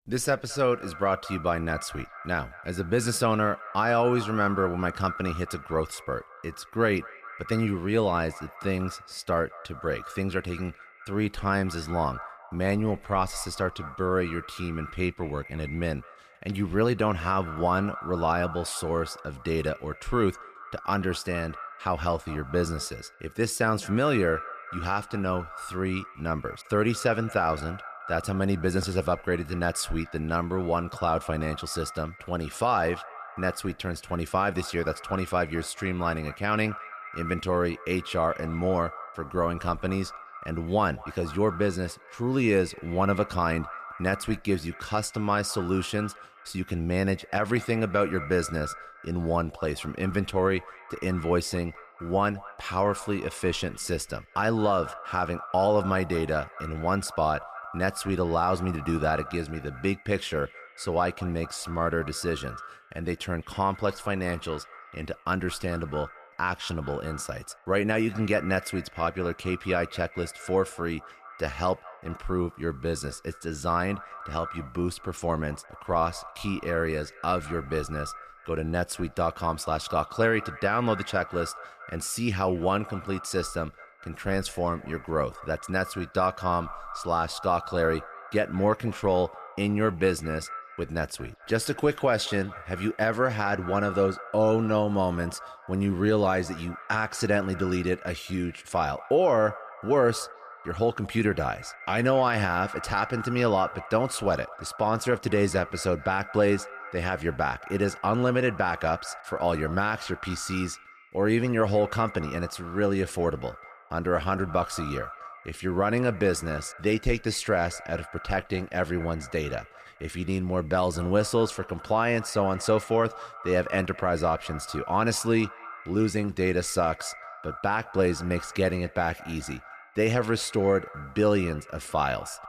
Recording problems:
echo of what is said; noticeable; throughout; 210 ms later, 15 dB below the speech

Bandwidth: 14.5 kHz